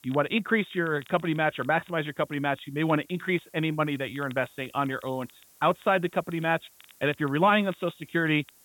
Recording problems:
high frequencies cut off; severe; nothing above 4 kHz
hiss; faint; throughout; 30 dB below the speech
crackle, like an old record; faint; 25 dB below the speech

